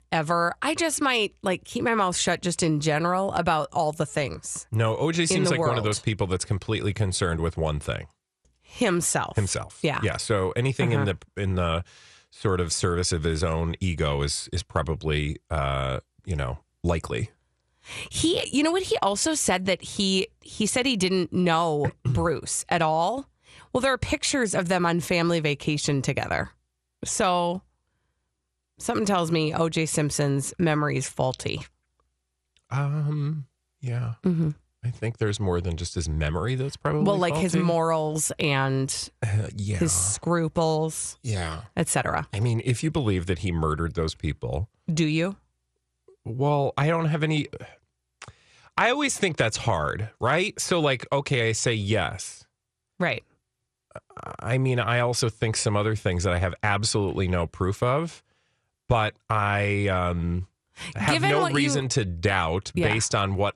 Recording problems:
none

